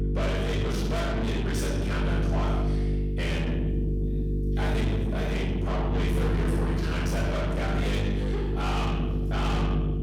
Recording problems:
distortion; heavy; 6 dB below the speech
room echo; strong; dies away in 1 s
off-mic speech; far
electrical hum; loud; throughout; 50 Hz, 6 dB below the speech

